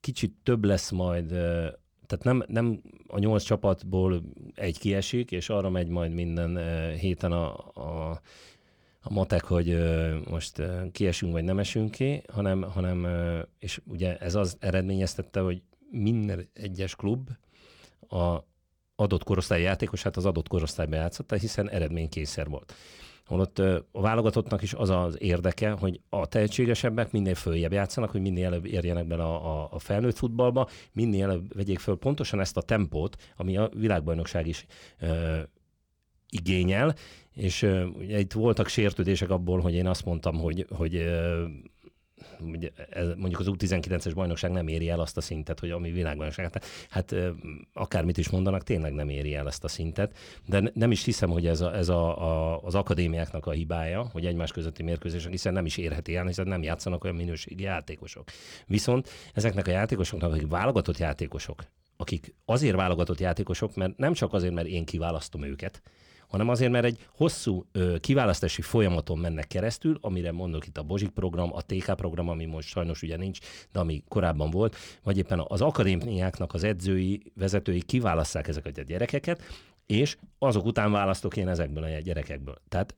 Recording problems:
none

